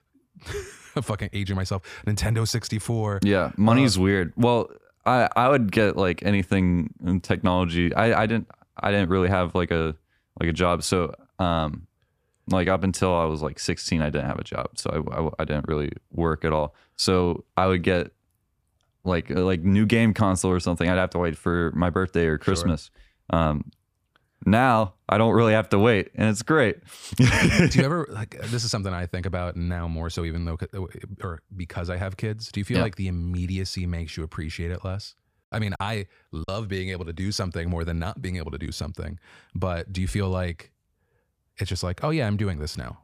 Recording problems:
choppy; occasionally; at 36 s; 4% of the speech affected

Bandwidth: 15 kHz